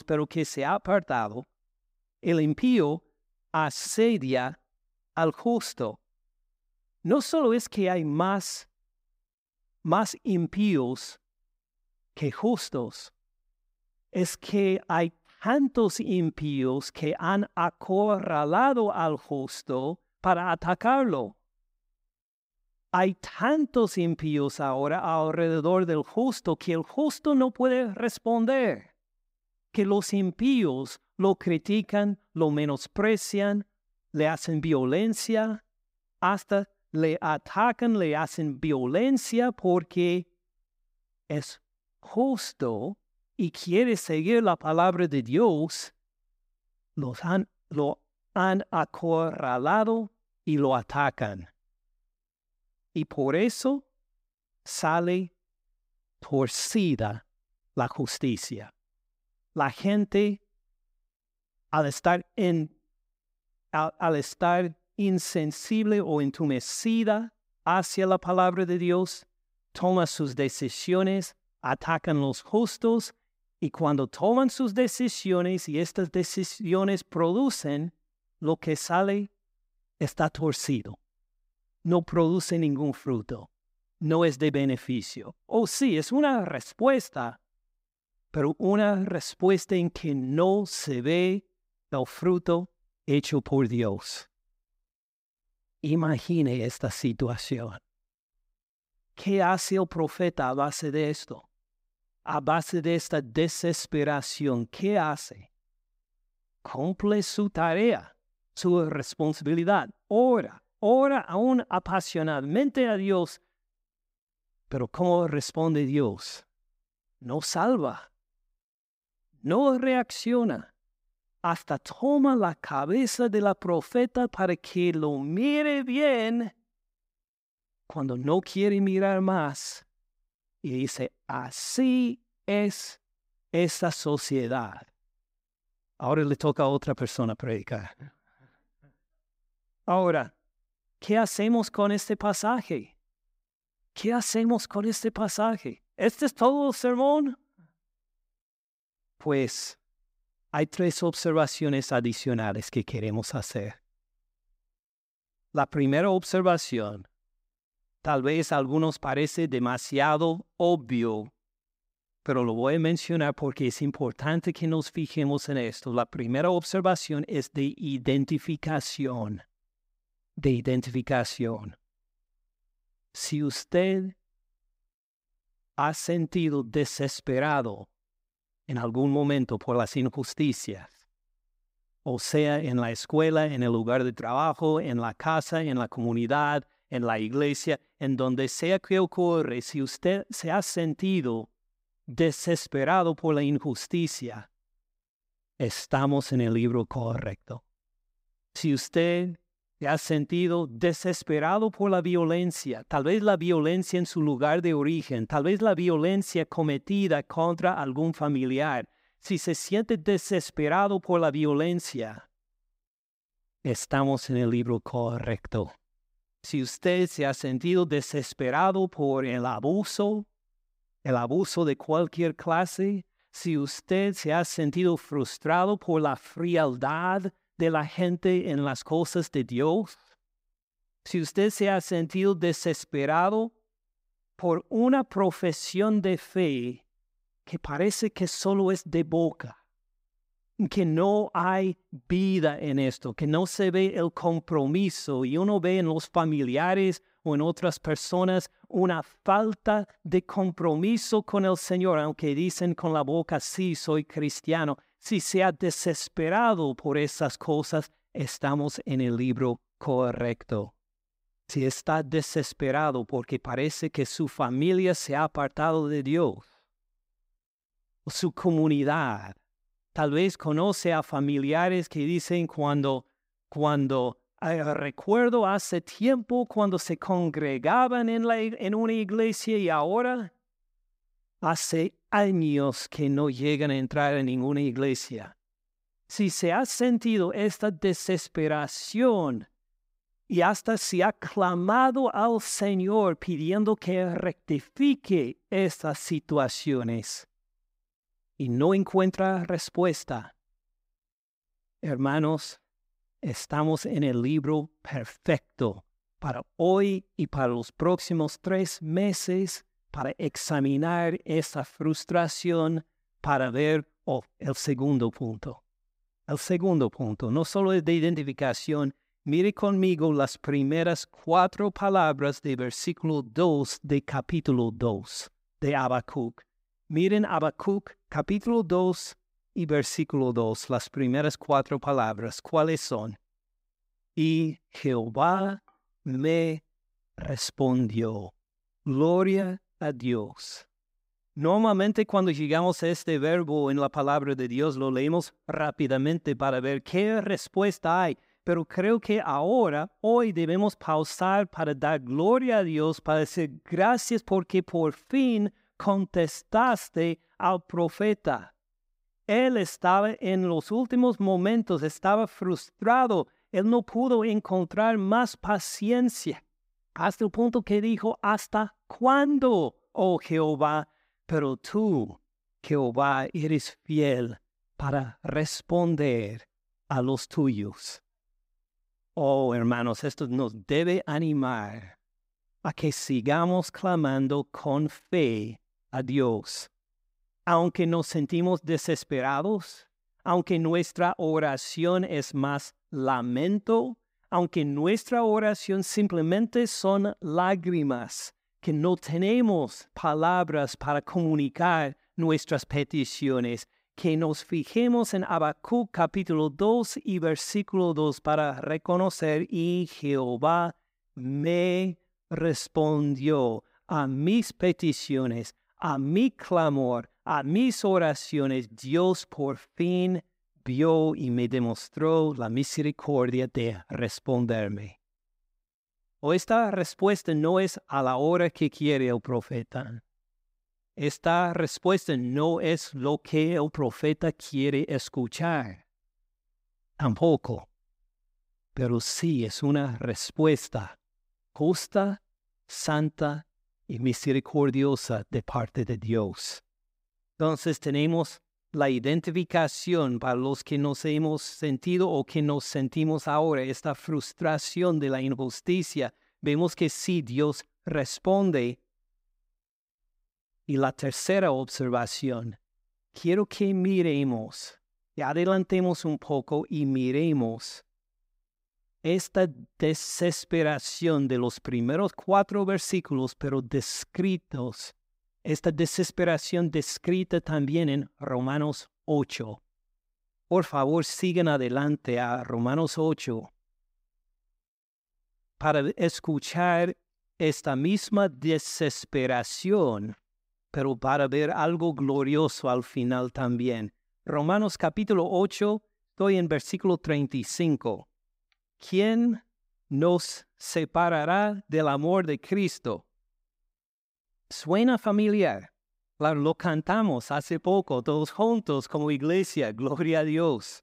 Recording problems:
none

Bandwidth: 15.5 kHz